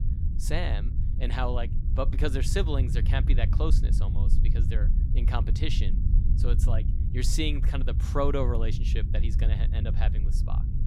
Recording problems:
low rumble; loud; throughout; 9 dB below the speech

